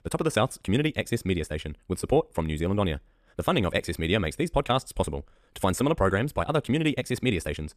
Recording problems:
wrong speed, natural pitch; too fast; 1.7 times normal speed

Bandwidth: 14.5 kHz